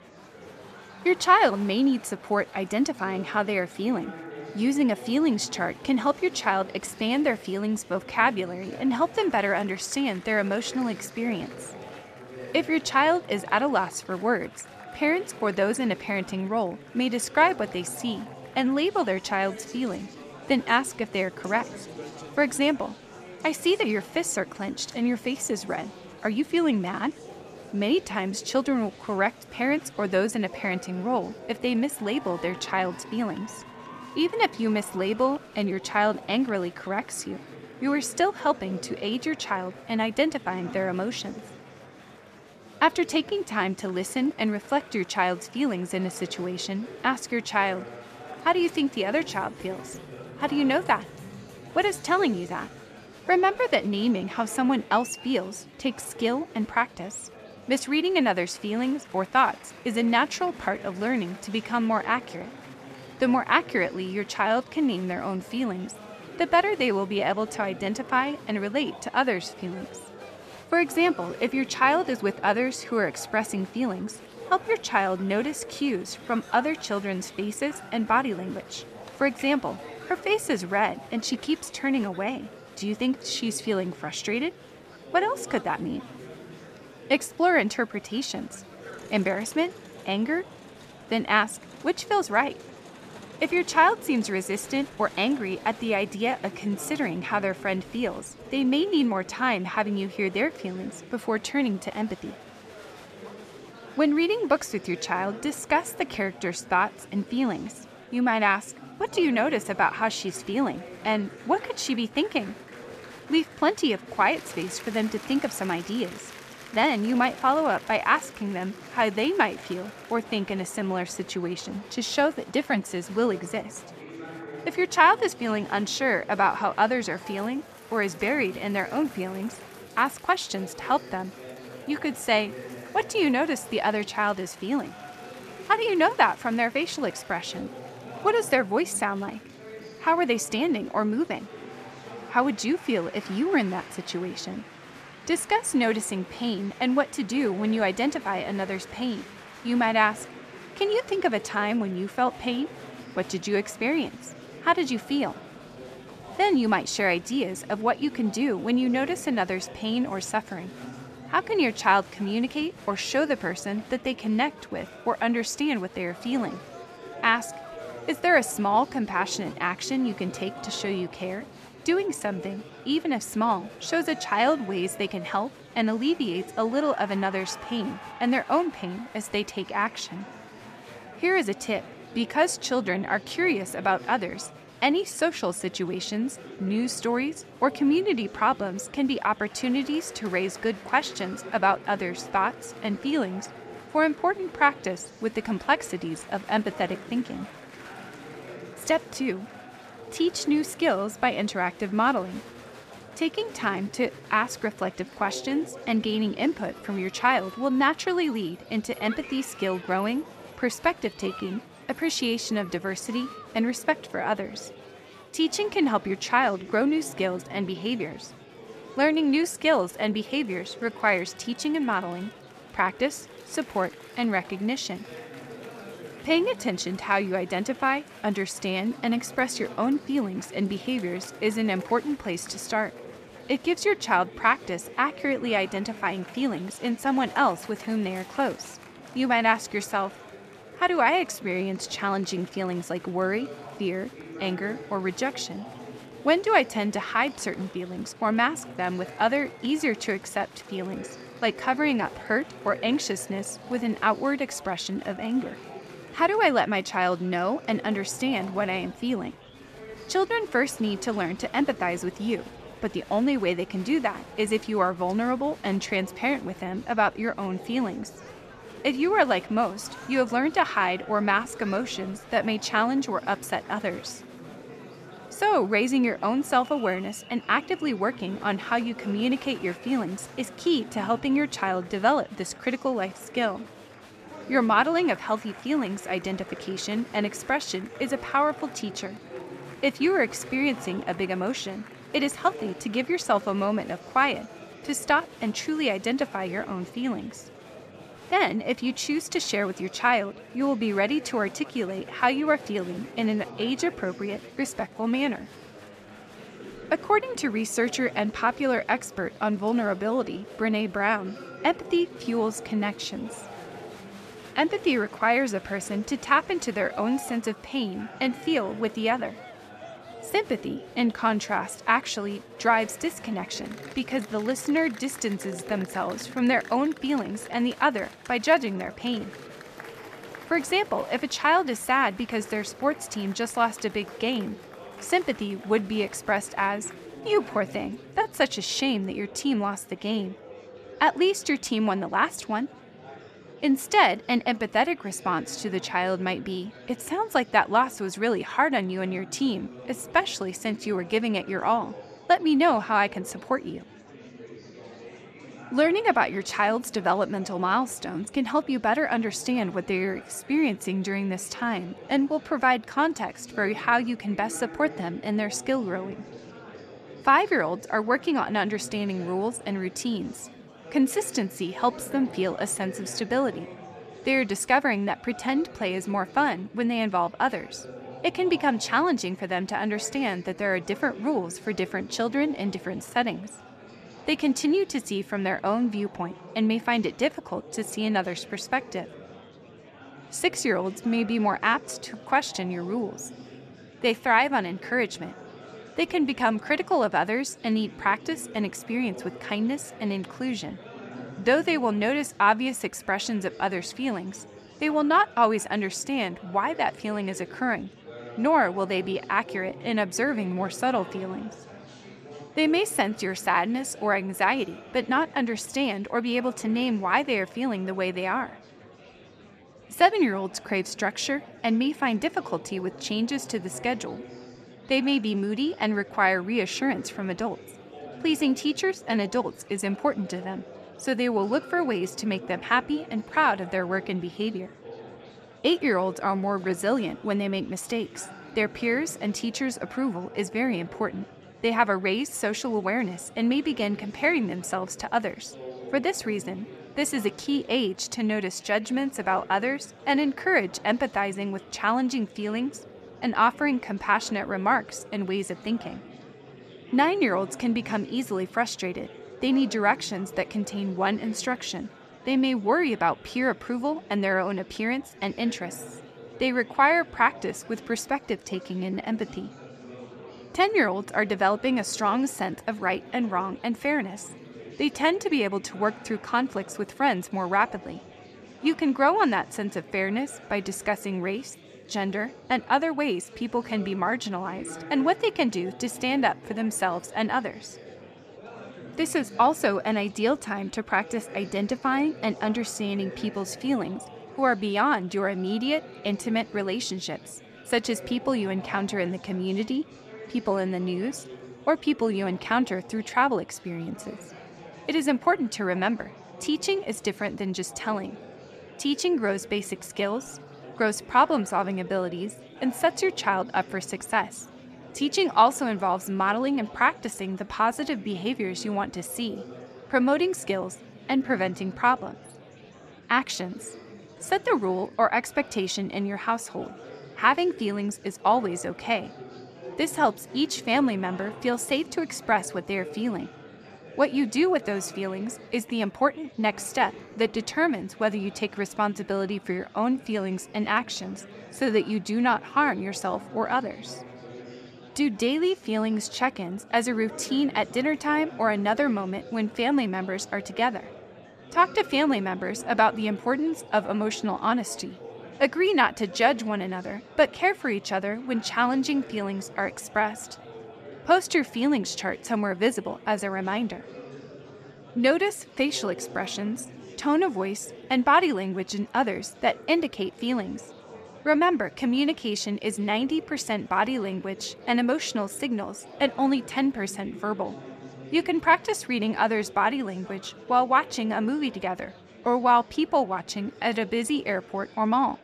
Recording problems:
murmuring crowd; noticeable; throughout; 15 dB below the speech

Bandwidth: 14.5 kHz